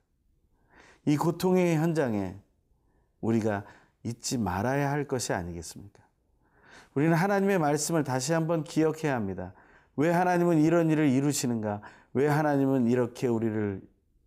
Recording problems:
none

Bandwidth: 15.5 kHz